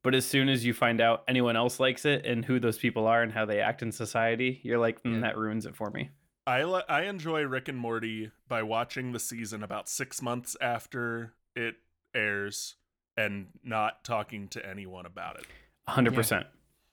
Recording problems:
none

